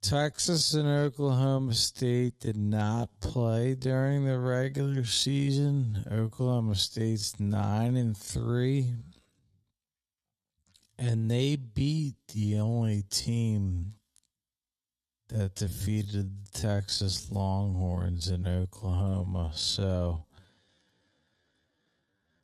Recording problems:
wrong speed, natural pitch; too slow; 0.5 times normal speed

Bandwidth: 13.5 kHz